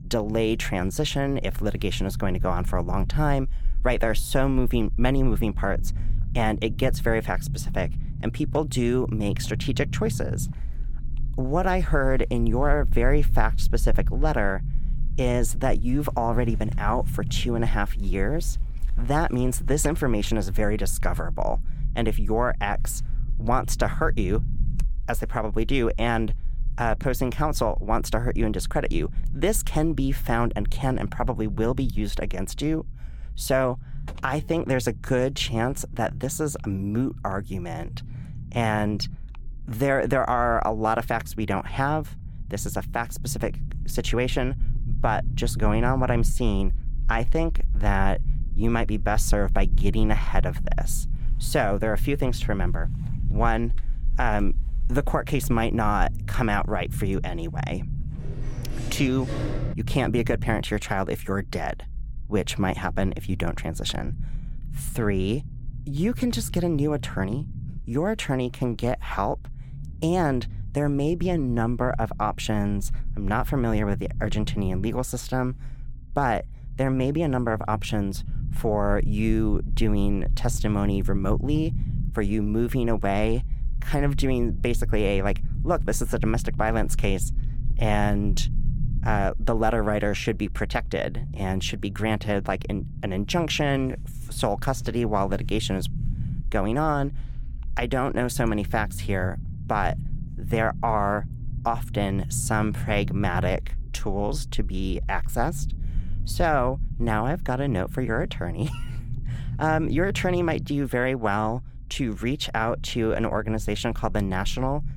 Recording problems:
low rumble; noticeable; throughout; 20 dB below the speech
door banging; noticeable; from 58 s to 1:00; peak 7 dB below the speech

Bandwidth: 17 kHz